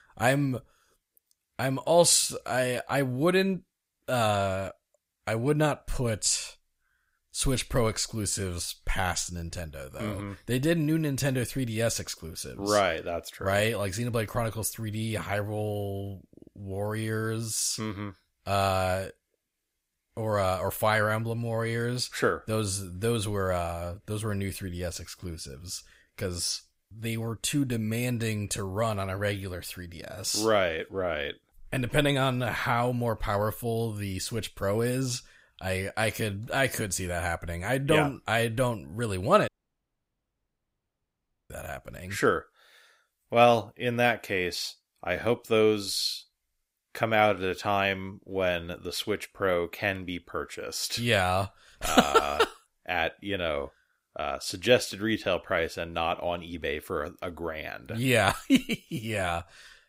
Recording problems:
audio cutting out; at 39 s for 2 s

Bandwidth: 15.5 kHz